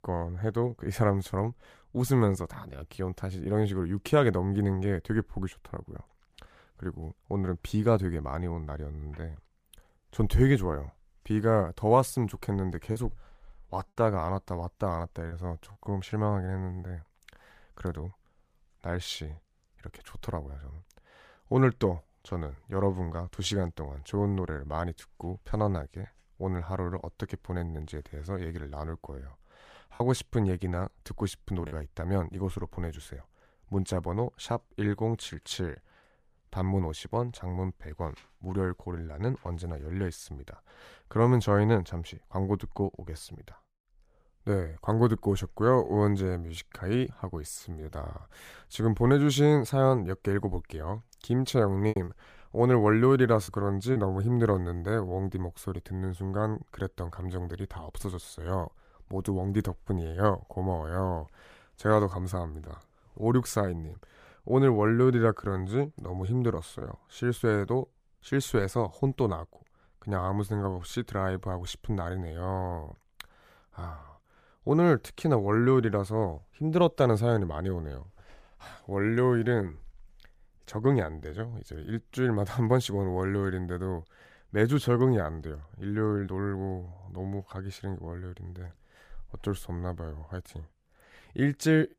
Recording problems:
choppy; occasionally; from 13 to 15 s, from 30 to 32 s and from 52 to 54 s; 5% of the speech affected

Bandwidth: 15 kHz